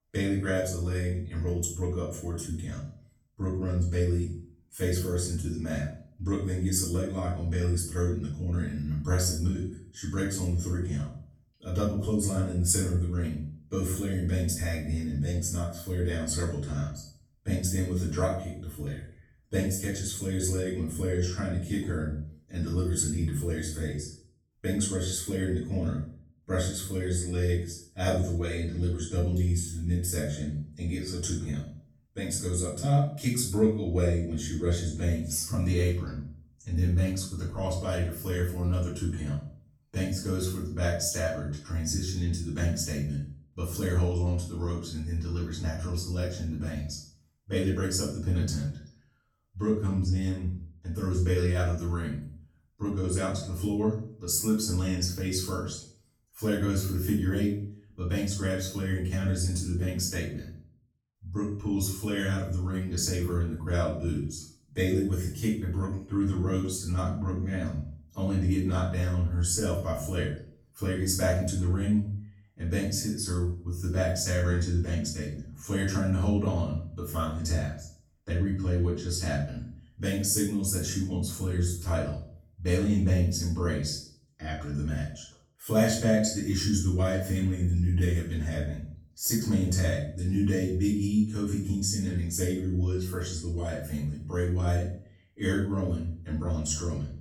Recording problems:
off-mic speech; far
room echo; noticeable; dies away in 0.5 s

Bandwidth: 17.5 kHz